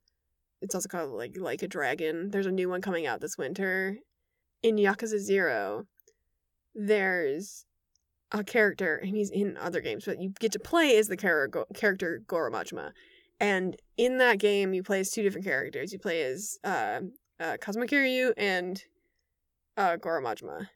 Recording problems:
none

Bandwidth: 18.5 kHz